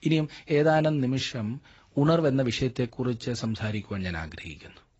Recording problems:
garbled, watery; badly; nothing above 7.5 kHz

